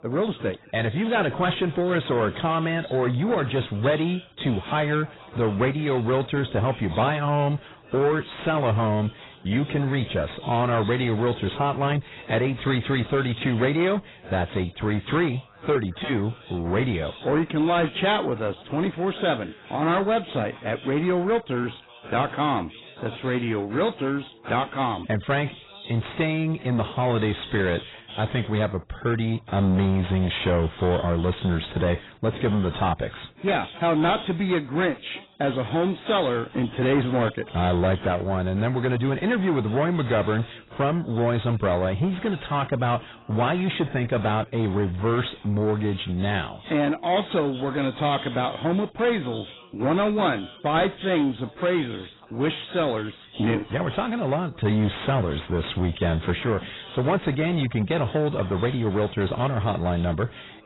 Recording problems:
garbled, watery; badly; nothing above 4 kHz
distortion; slight; 10 dB below the speech
background chatter; faint; throughout; 3 voices, 20 dB below the speech

